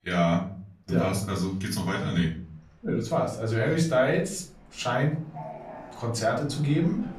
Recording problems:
off-mic speech; far
room echo; slight; dies away in 0.4 s
train or aircraft noise; noticeable; throughout; 20 dB below the speech

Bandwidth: 14.5 kHz